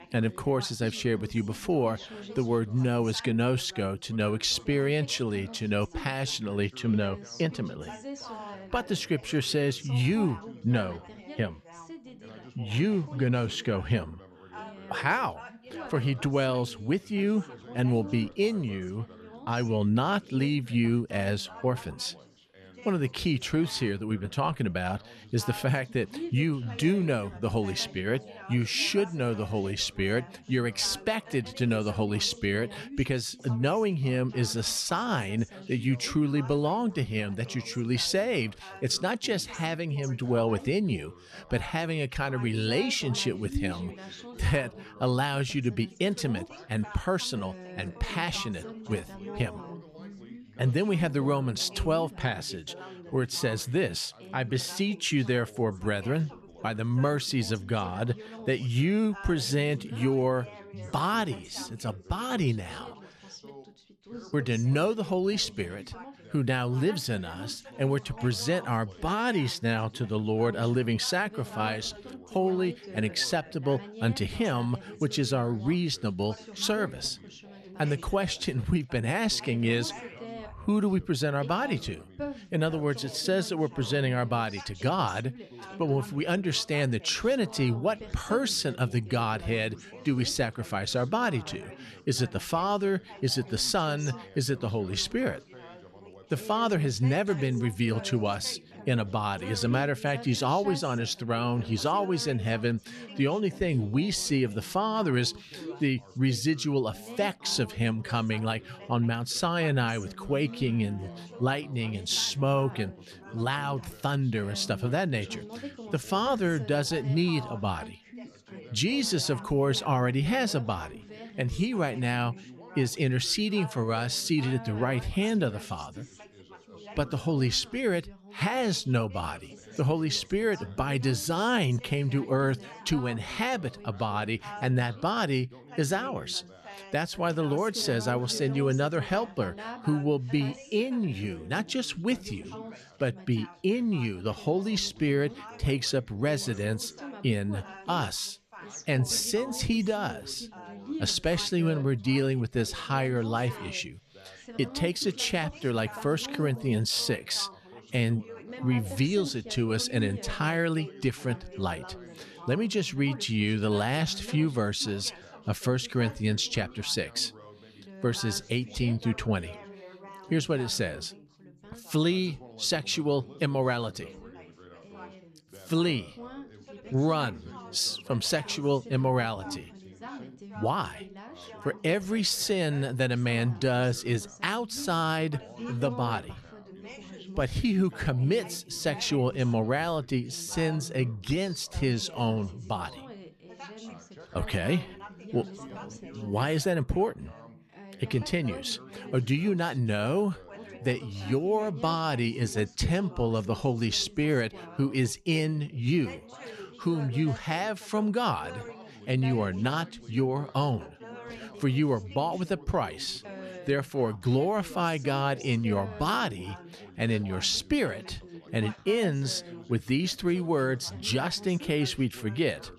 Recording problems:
background chatter; noticeable; throughout; 3 voices, 15 dB below the speech

